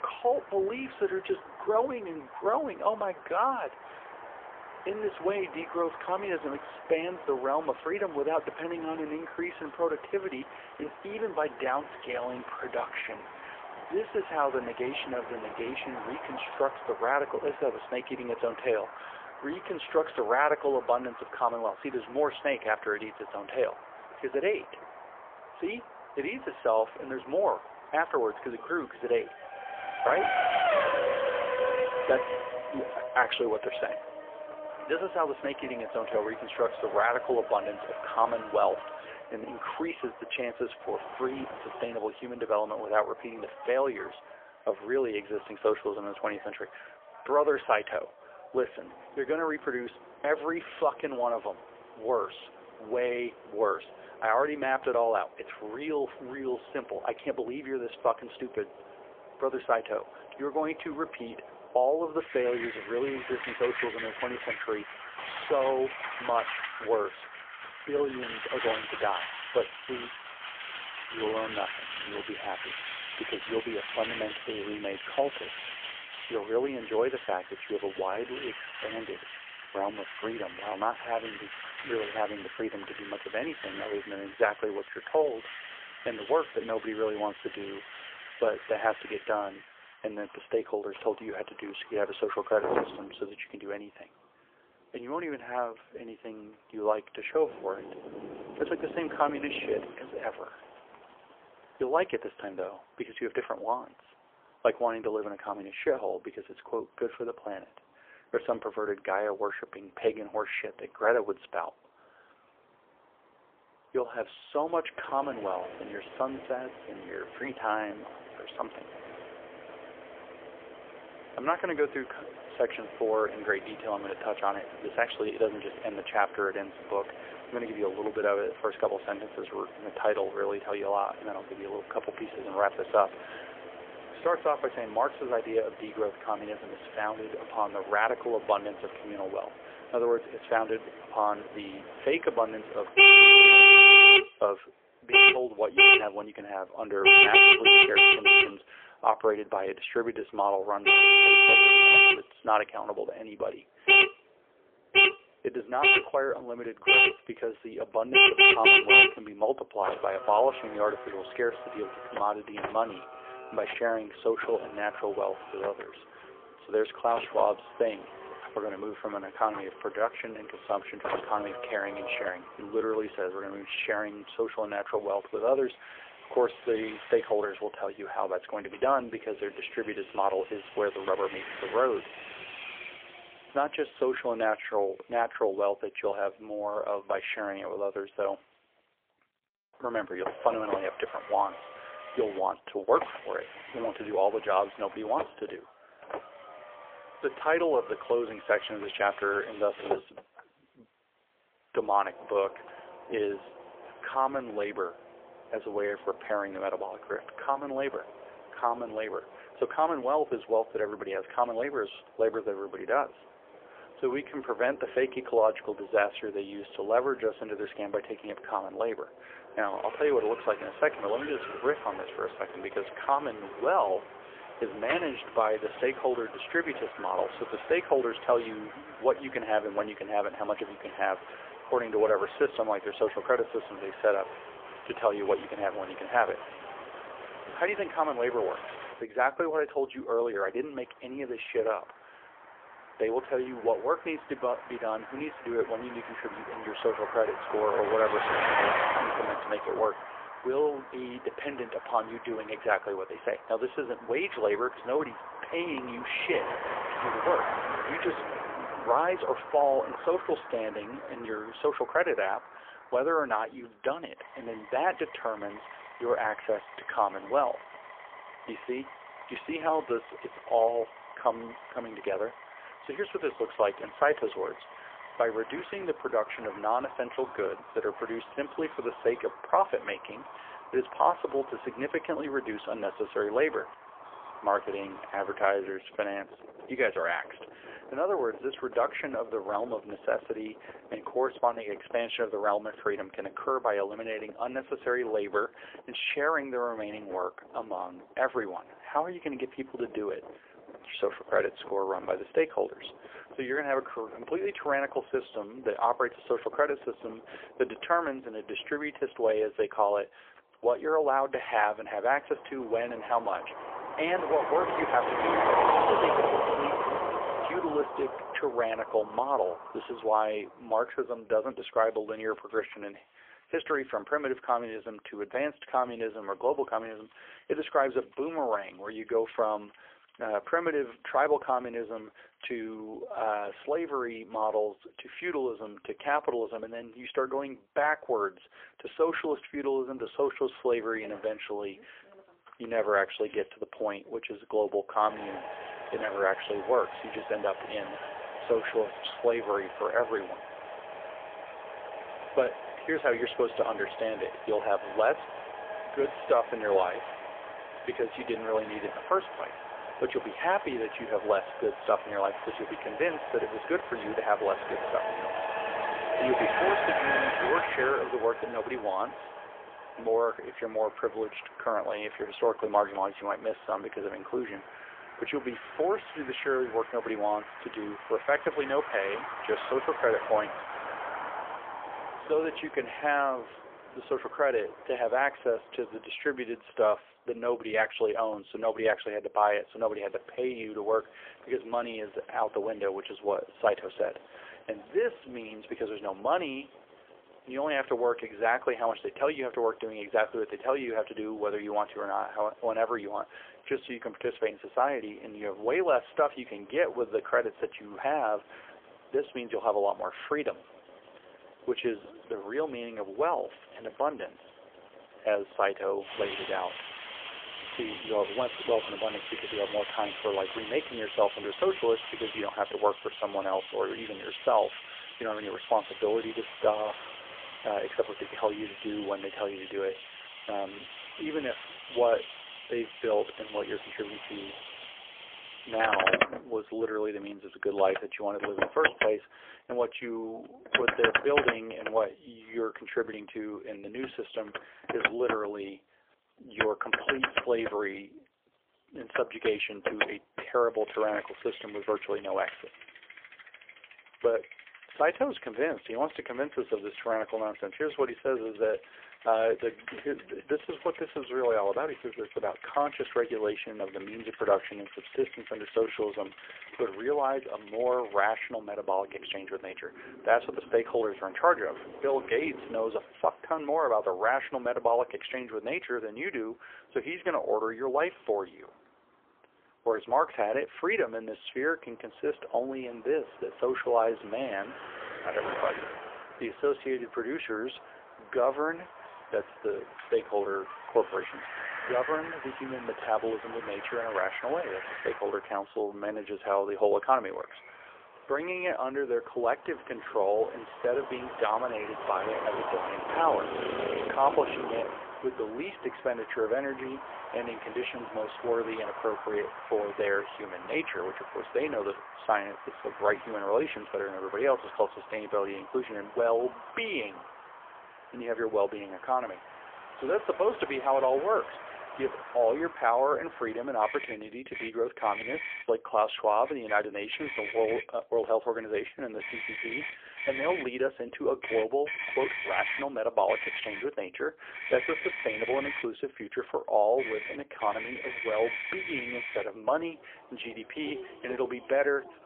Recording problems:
phone-call audio; poor line; nothing above 3.5 kHz
traffic noise; very loud; throughout; 6 dB above the speech

